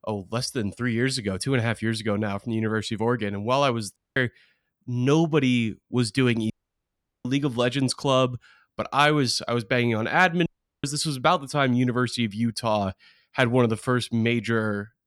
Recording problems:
audio cutting out; at 4 s, at 6.5 s for 1 s and at 10 s

